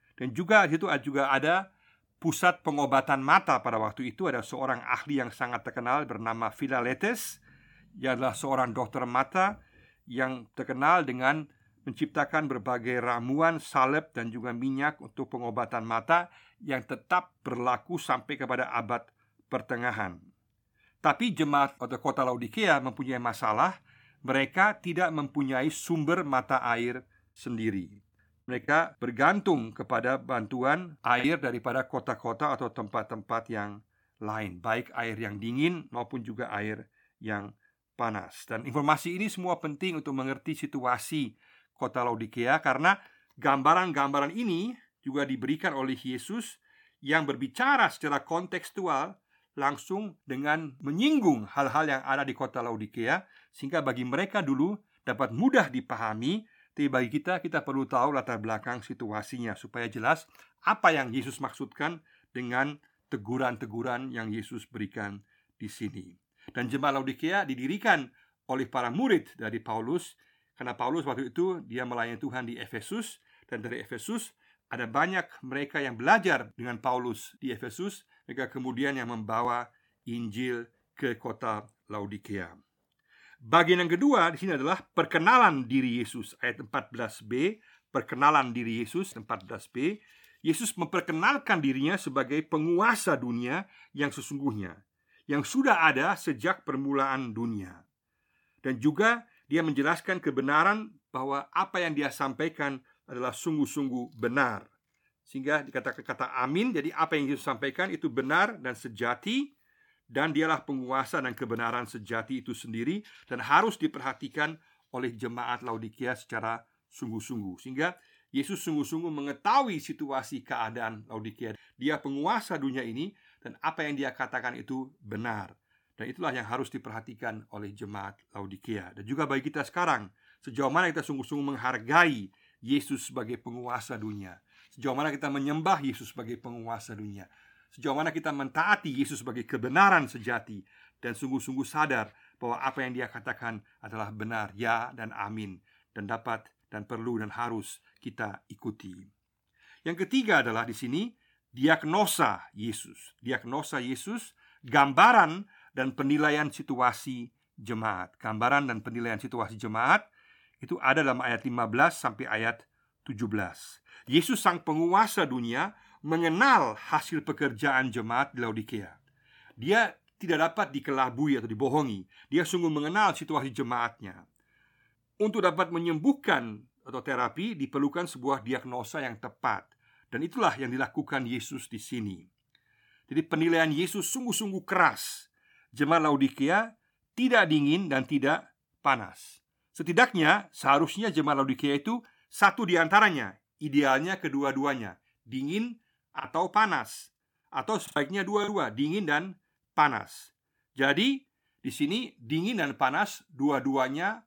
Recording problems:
choppy; very; from 29 to 31 s and from 3:16 to 3:18; 6% of the speech affected

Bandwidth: 18 kHz